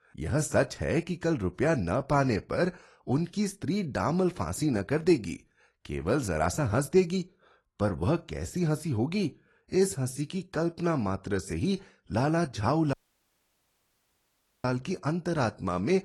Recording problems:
garbled, watery; slightly; nothing above 11.5 kHz
audio cutting out; at 13 s for 1.5 s

